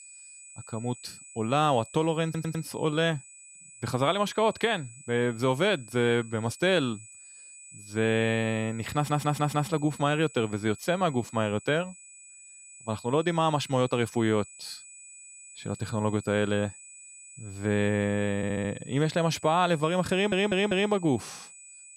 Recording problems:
high-pitched whine; noticeable; throughout; 8 kHz, 20 dB below the speech
audio stuttering; 4 times, first at 2 s

